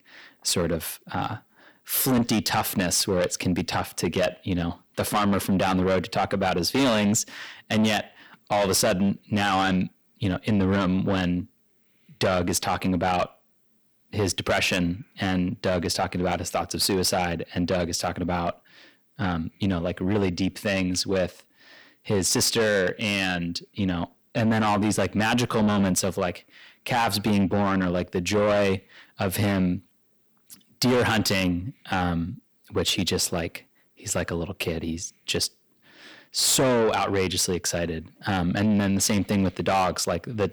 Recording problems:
distortion; heavy; 7 dB below the speech

